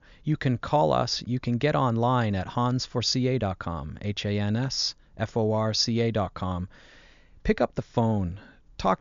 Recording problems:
high frequencies cut off; noticeable; nothing above 7 kHz

